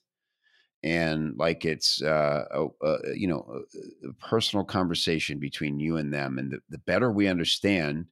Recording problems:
none

